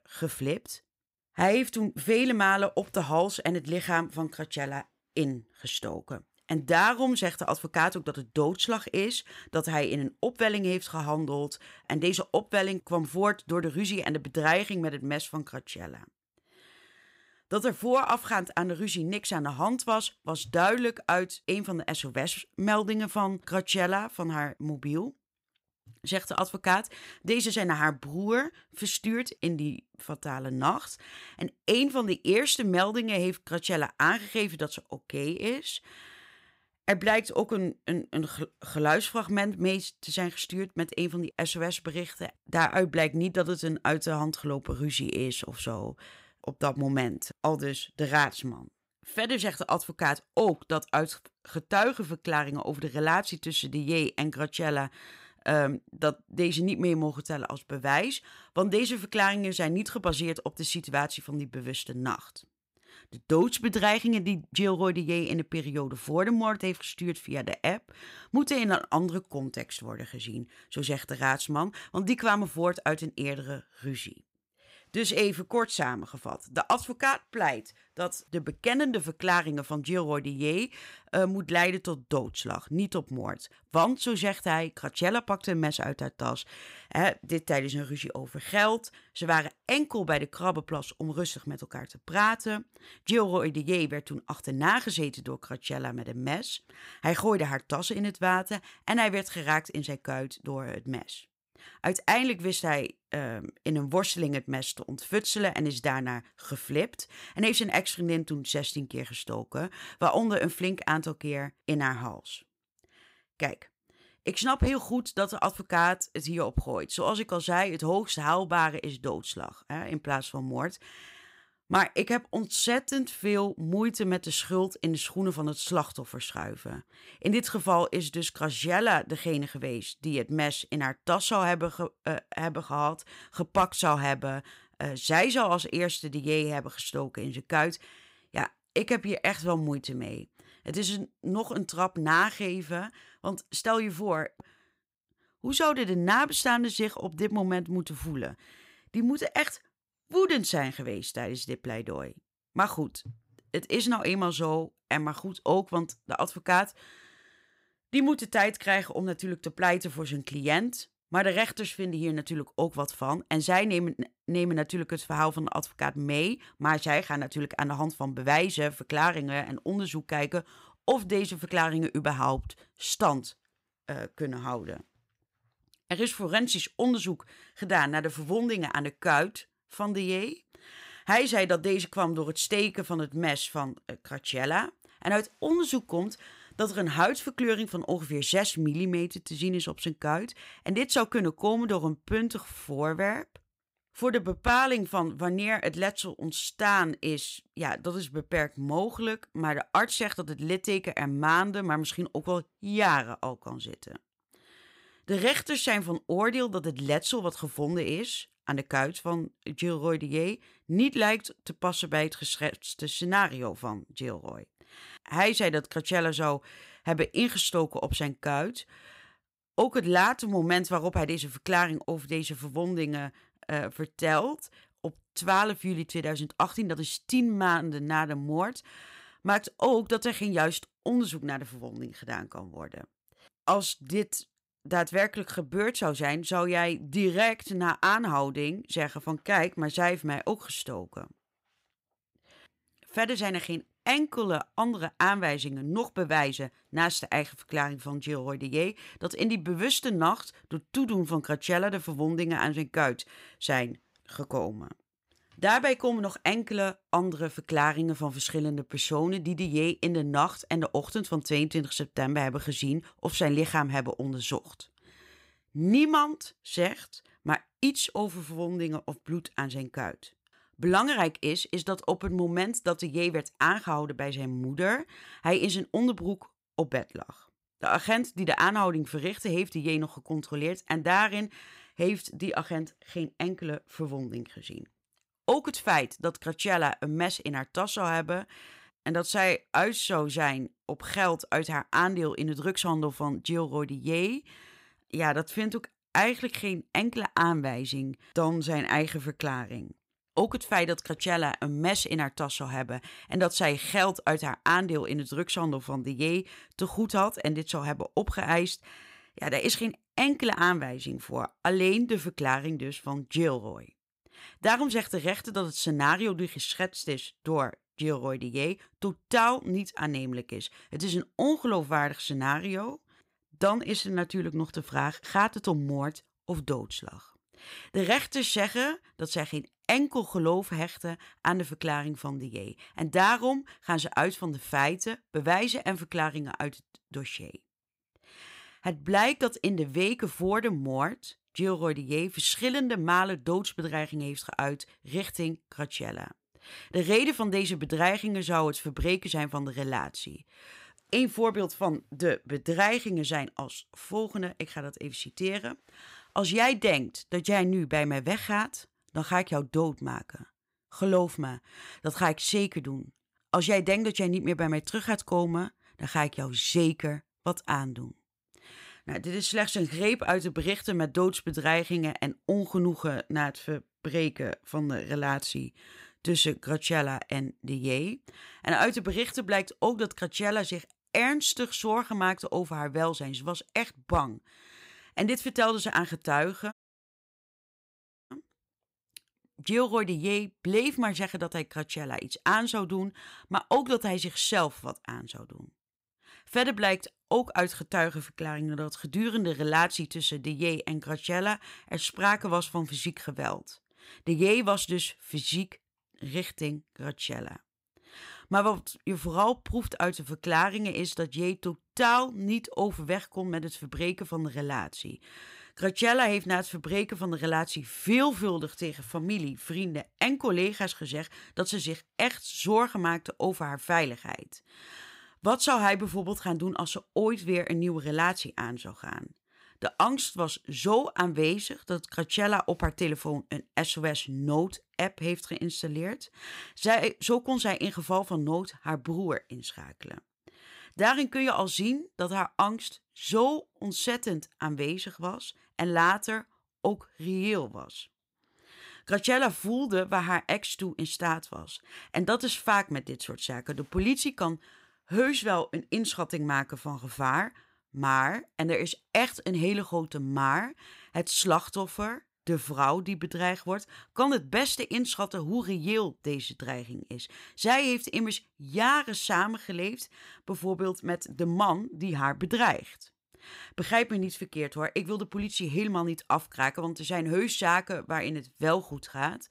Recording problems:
audio cutting out; at 6:27 for 1.5 s

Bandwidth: 15.5 kHz